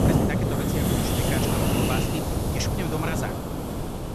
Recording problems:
wind noise on the microphone; heavy; 5 dB above the speech

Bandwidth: 13.5 kHz